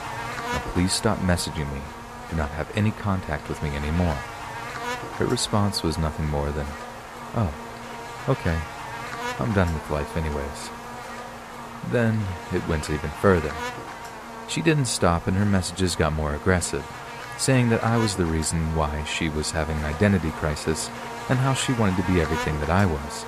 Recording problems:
electrical hum; loud; throughout; 50 Hz, 6 dB below the speech

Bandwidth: 14.5 kHz